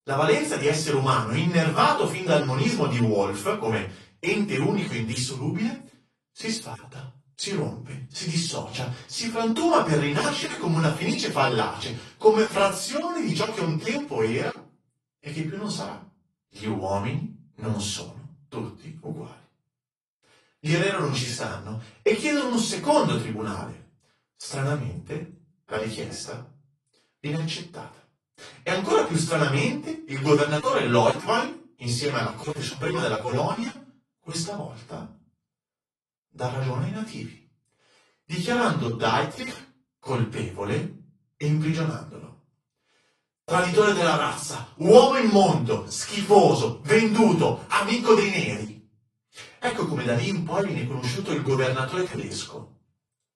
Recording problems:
off-mic speech; far
room echo; slight; dies away in 0.3 s
garbled, watery; slightly

